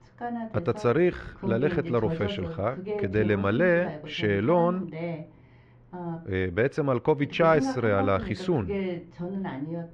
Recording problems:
muffled; very; fading above 2 kHz
voice in the background; loud; throughout; 8 dB below the speech

